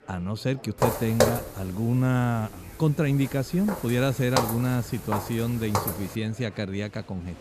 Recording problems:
murmuring crowd; faint; throughout; 25 dB below the speech
footsteps; loud; from 1 to 6 s; peak 3 dB above the speech

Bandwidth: 14.5 kHz